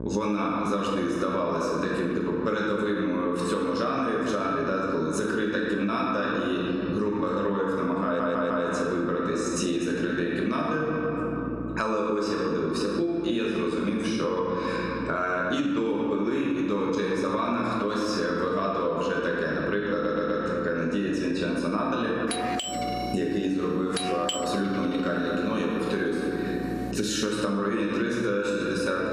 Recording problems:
off-mic speech; far
room echo; noticeable; dies away in 1.7 s
squashed, flat; somewhat
electrical hum; faint; throughout; 60 Hz, 25 dB below the speech
audio stuttering; at 8 s and at 20 s
doorbell; noticeable; from 22 to 27 s; peak 2 dB below the speech

